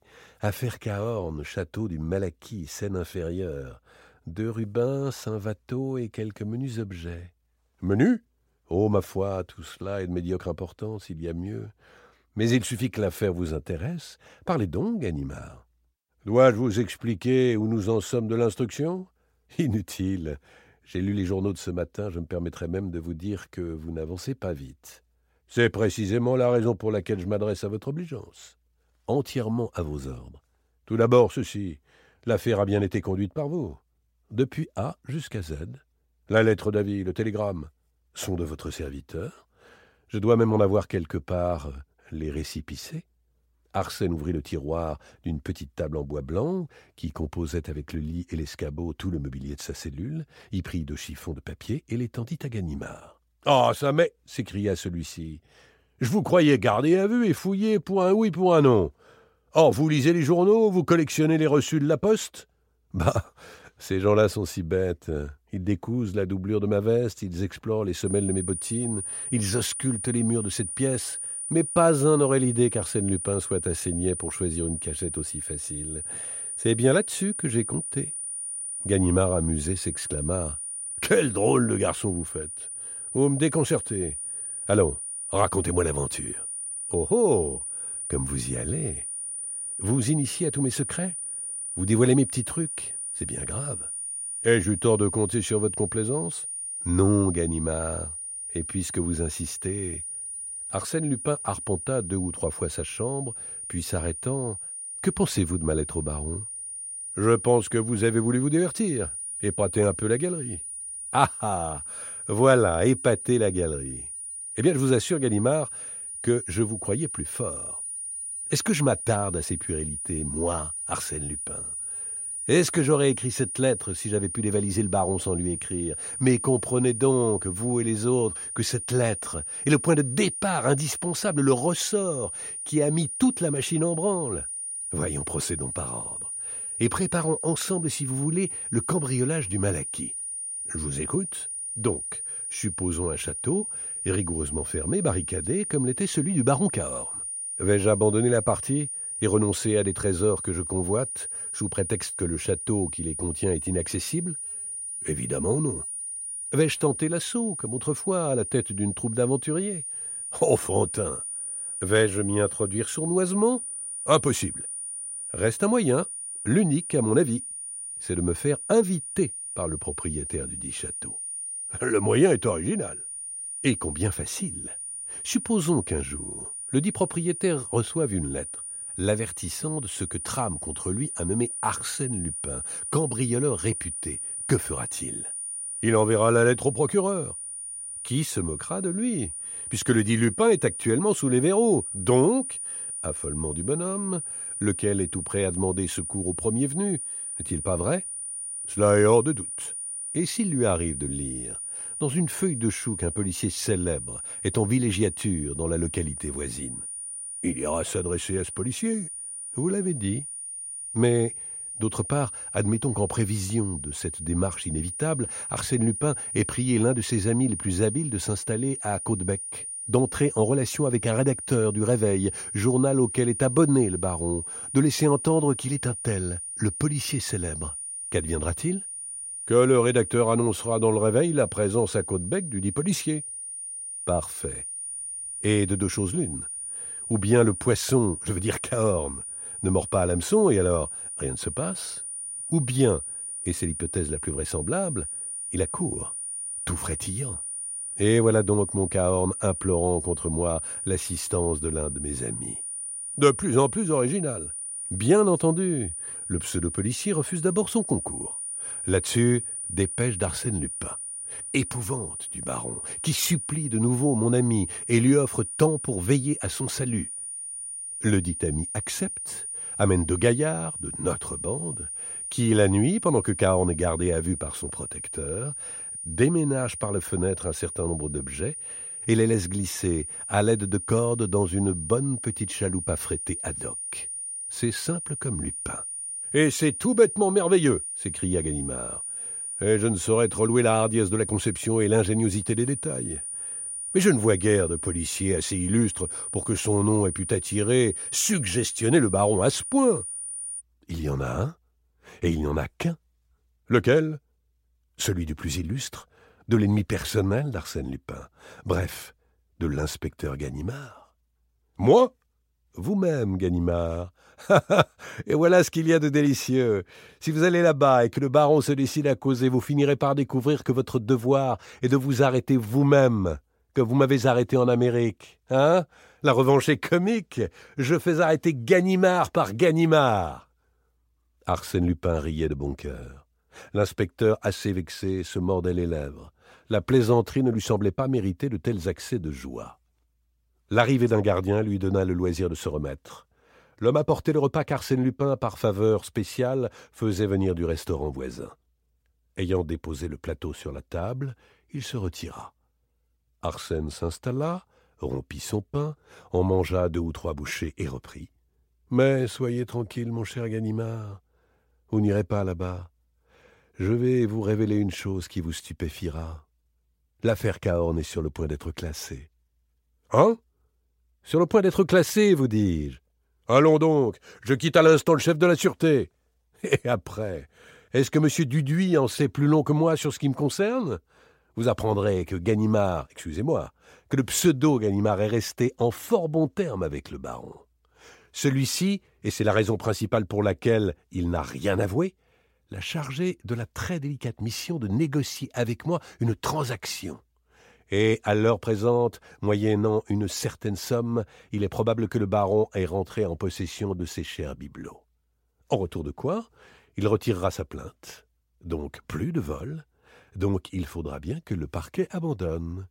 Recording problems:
high-pitched whine; loud; from 1:08 to 5:01; 9.5 kHz, 6 dB below the speech

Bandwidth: 16 kHz